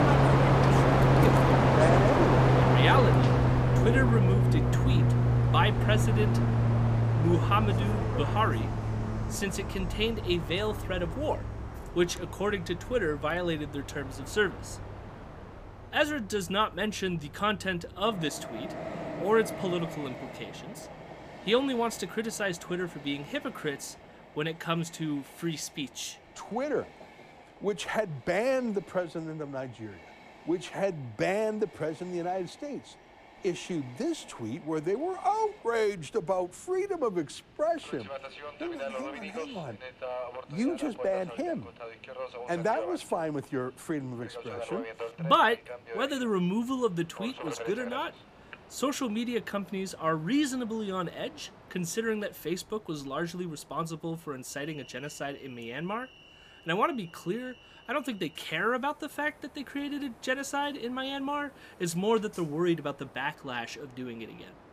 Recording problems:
train or aircraft noise; very loud; throughout; 4 dB above the speech

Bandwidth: 15 kHz